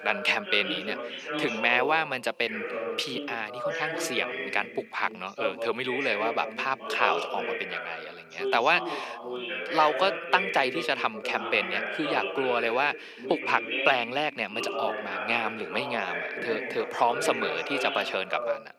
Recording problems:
thin; very; fading below 500 Hz
background chatter; loud; throughout; 2 voices, 5 dB below the speech

